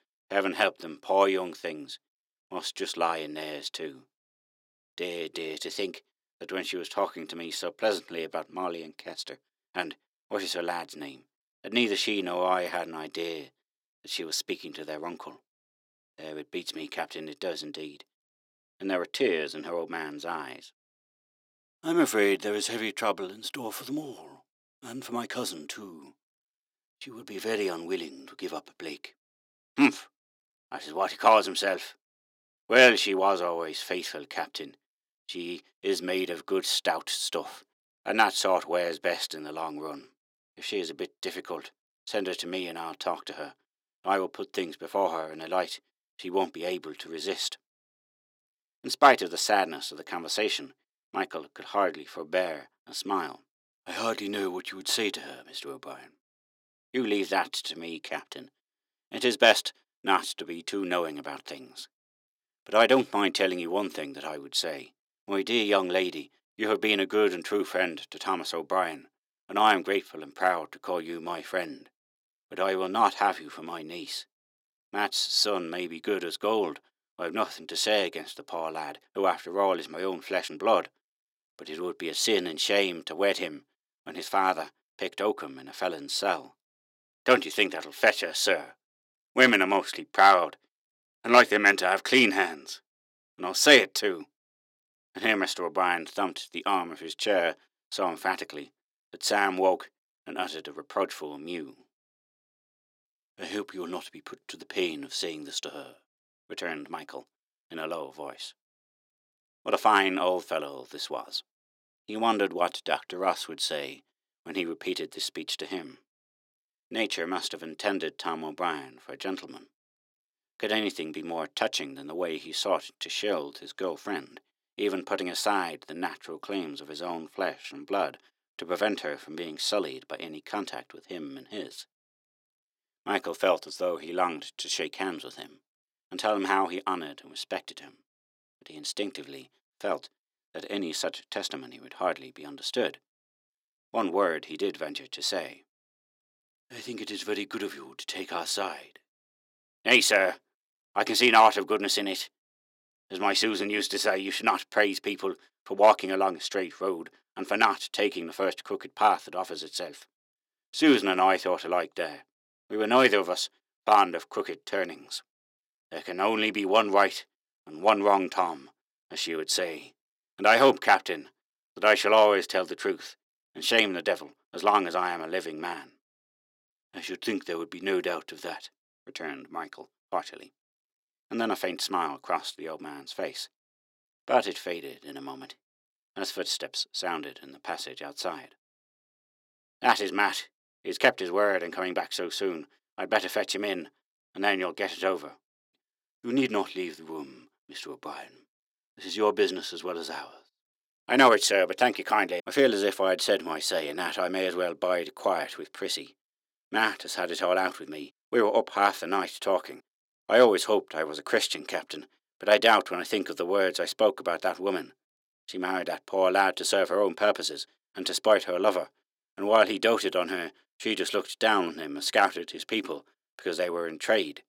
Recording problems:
thin; somewhat; fading below 300 Hz

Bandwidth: 16.5 kHz